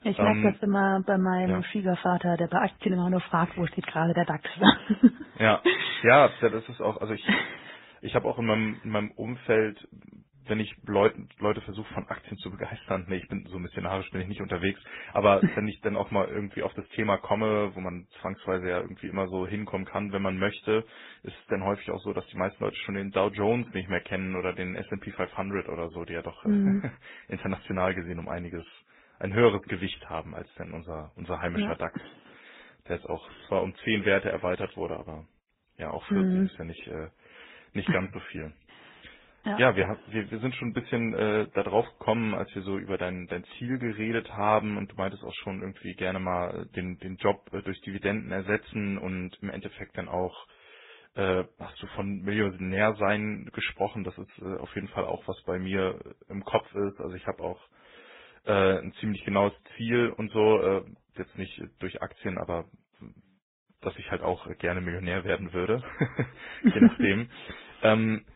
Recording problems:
garbled, watery; badly
high frequencies cut off; severe; nothing above 4 kHz

